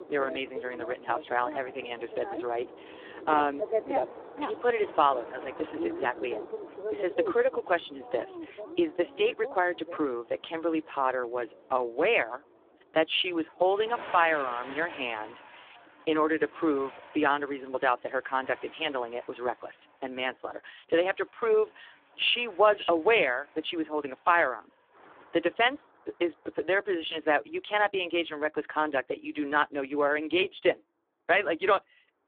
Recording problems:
phone-call audio; poor line; nothing above 3.5 kHz
traffic noise; loud; throughout; 10 dB below the speech

